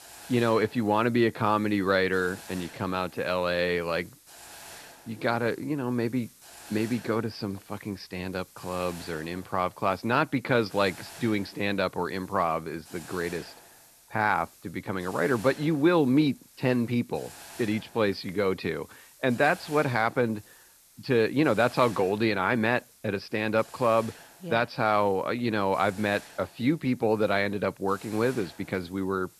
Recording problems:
high frequencies cut off; noticeable; nothing above 5.5 kHz
hiss; faint; throughout; 20 dB below the speech

